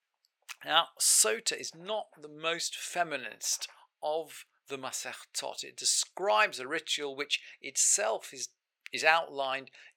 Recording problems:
thin; very; fading below 600 Hz

